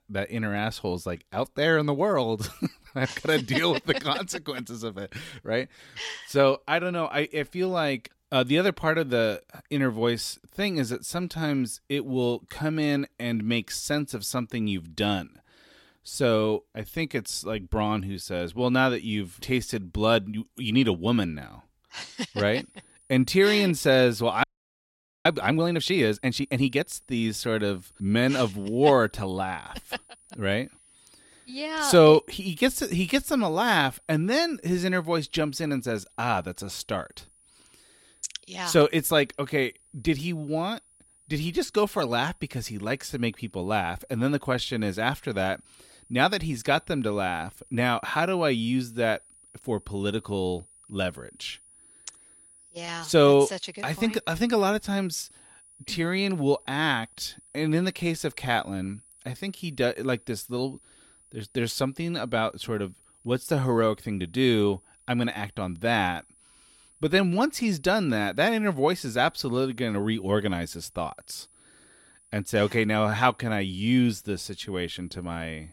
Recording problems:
high-pitched whine; faint; from 23 s on; 9.5 kHz, 30 dB below the speech
audio freezing; at 24 s for 1 s

